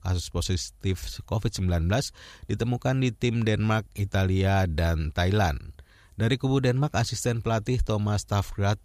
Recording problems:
none

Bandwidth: 14.5 kHz